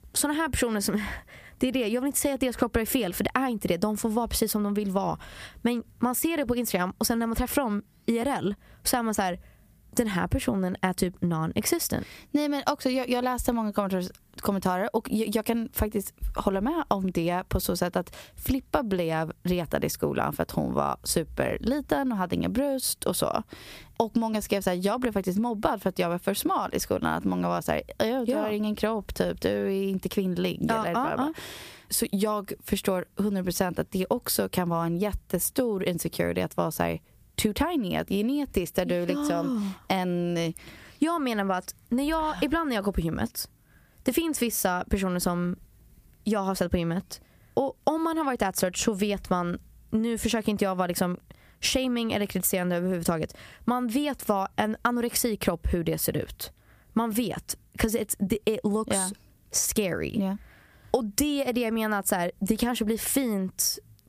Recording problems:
squashed, flat; somewhat

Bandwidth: 15 kHz